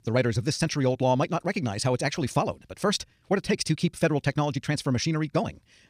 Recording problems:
wrong speed, natural pitch; too fast; 1.5 times normal speed

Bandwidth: 15.5 kHz